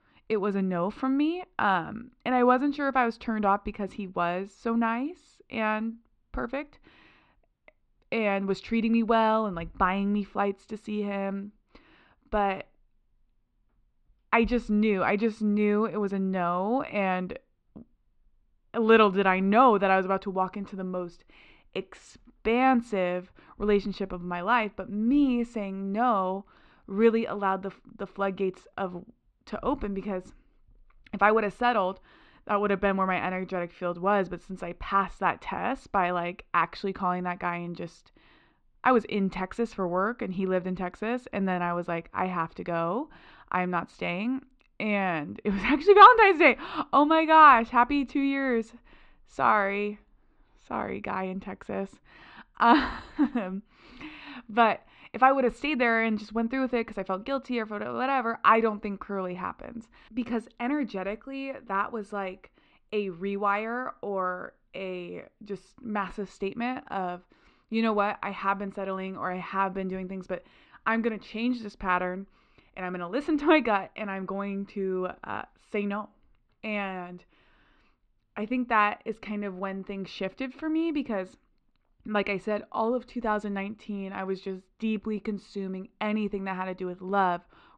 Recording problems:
muffled; slightly; fading above 3.5 kHz

